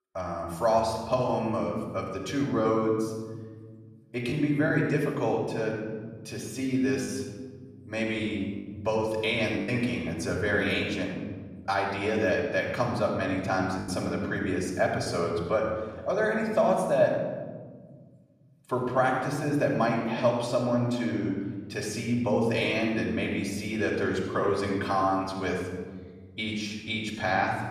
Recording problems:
off-mic speech; far
room echo; noticeable; dies away in 1.7 s
choppy; occasionally; from 4.5 to 7 s, at 9.5 s and from 14 to 15 s; 3% of the speech affected

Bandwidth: 14 kHz